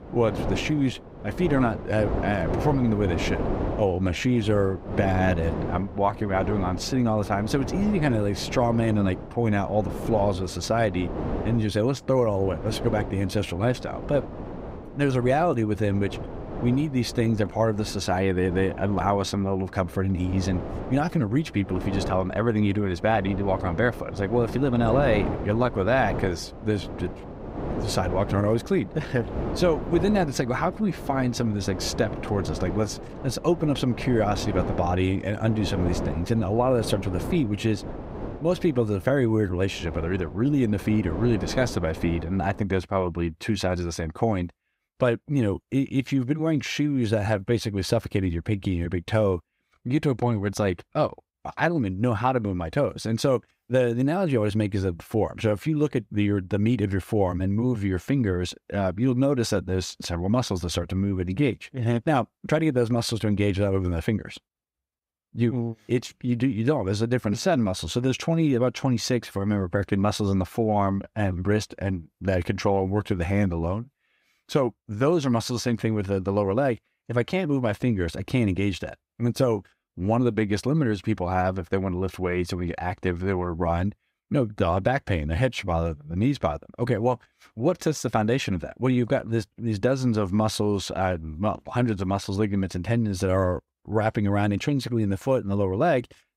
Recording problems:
wind noise on the microphone; heavy; until 43 s; 9 dB below the speech

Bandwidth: 15.5 kHz